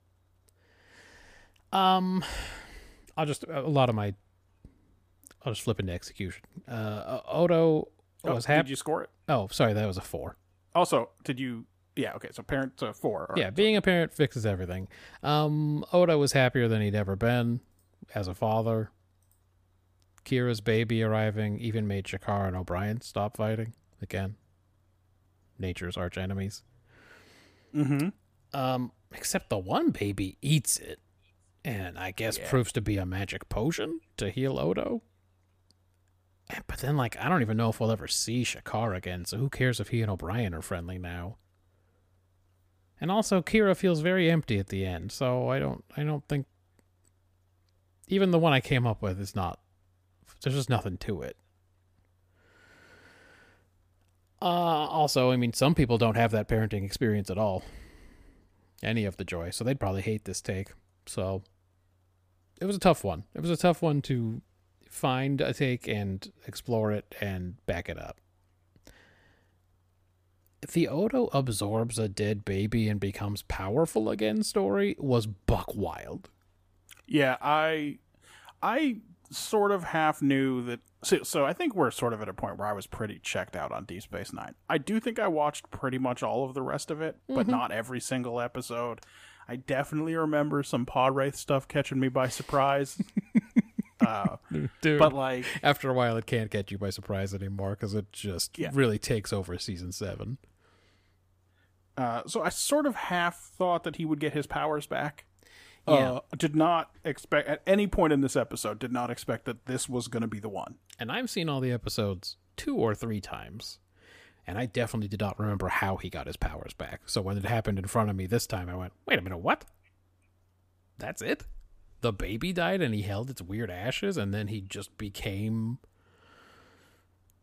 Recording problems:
none

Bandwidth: 15 kHz